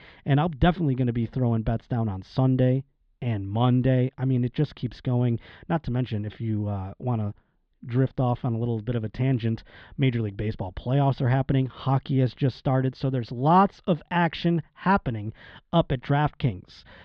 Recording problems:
muffled; slightly; fading above 4 kHz

